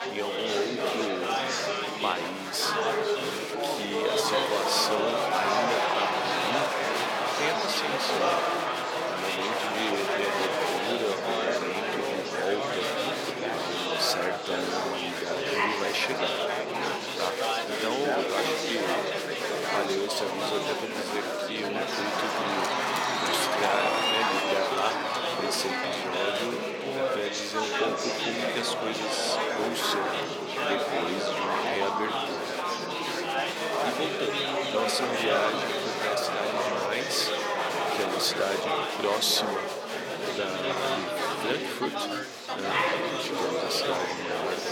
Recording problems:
thin; somewhat; fading below 500 Hz
chatter from many people; very loud; throughout; 4 dB above the speech

